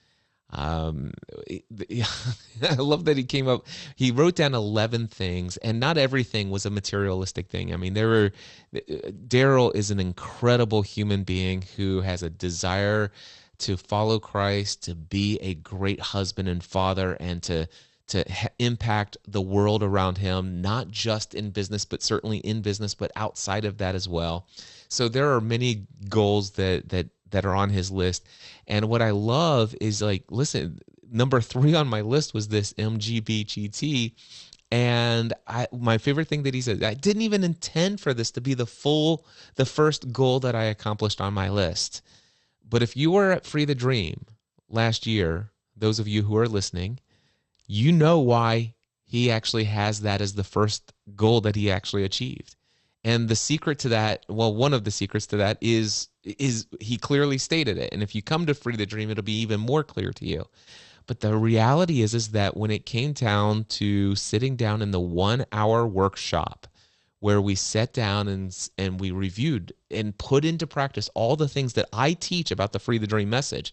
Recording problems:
garbled, watery; slightly; nothing above 8 kHz

